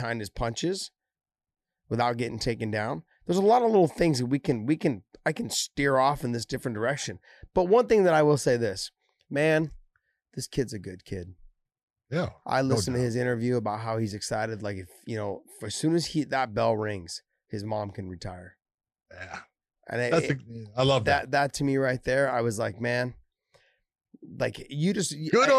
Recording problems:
abrupt cut into speech; at the start and the end

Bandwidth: 13.5 kHz